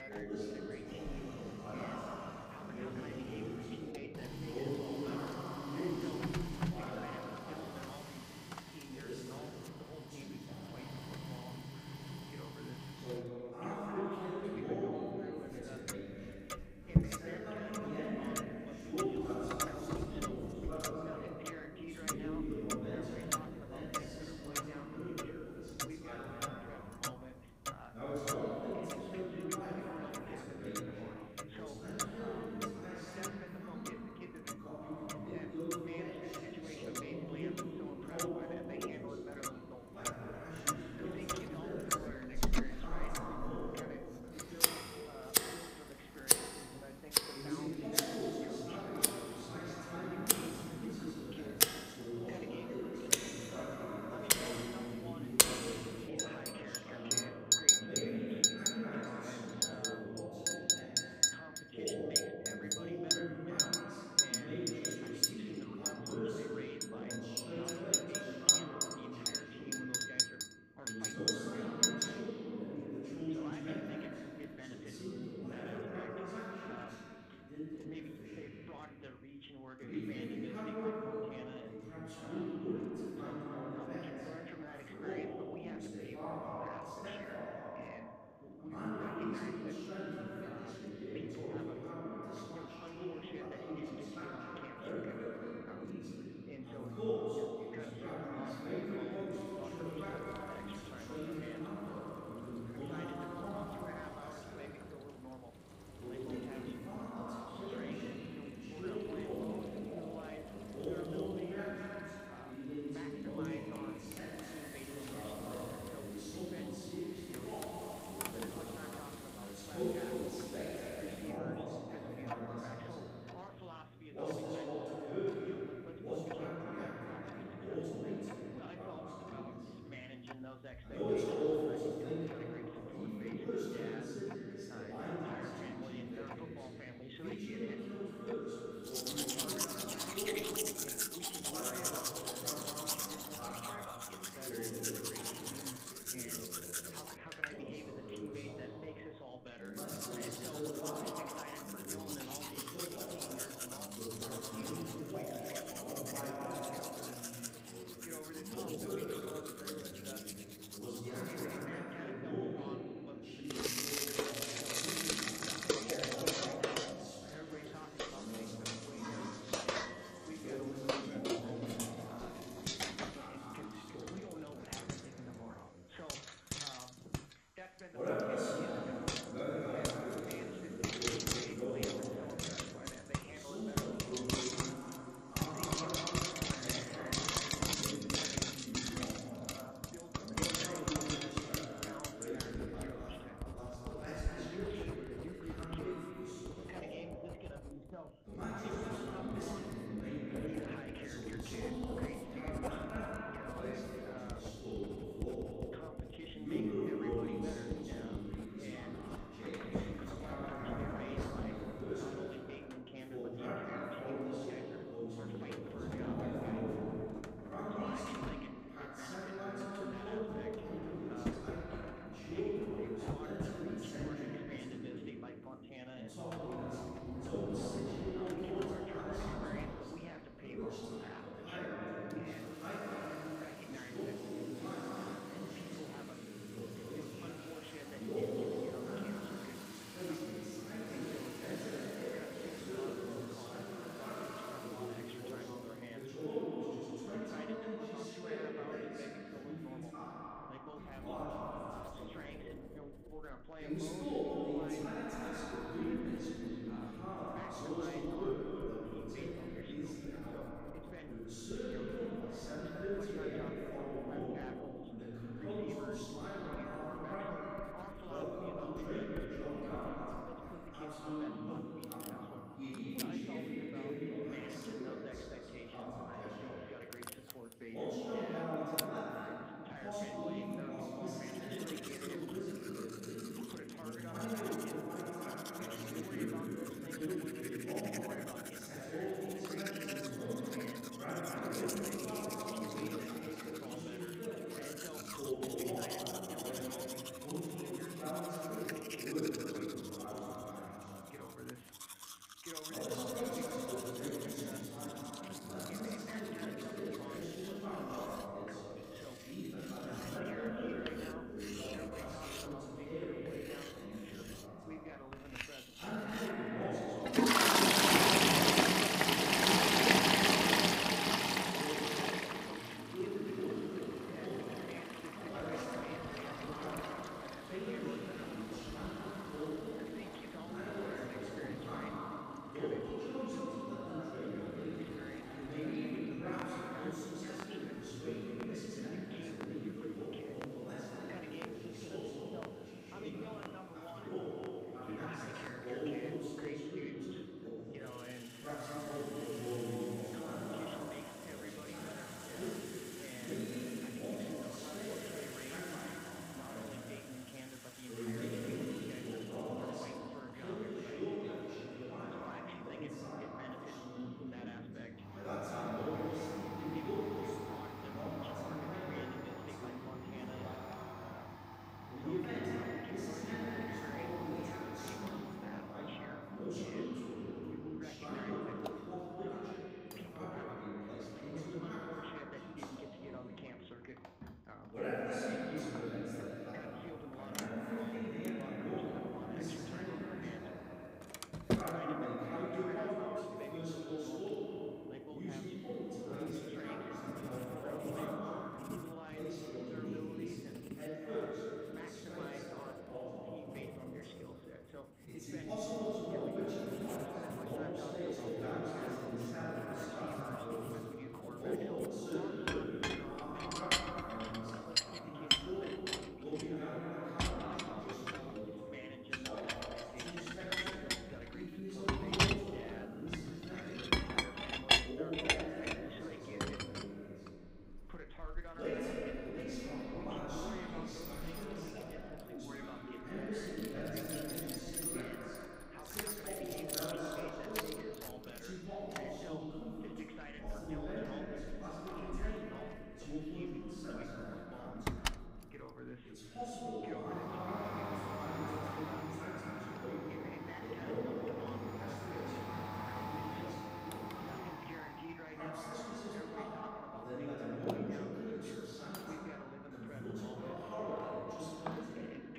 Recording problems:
echo of what is said; strong; throughout; 220 ms later, 6 dB below the speech
room echo; strong; dies away in 2.7 s
off-mic speech; far
household noises; very loud; throughout; 6 dB above the speech
voice in the background; loud; throughout; 8 dB below the speech

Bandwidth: 15.5 kHz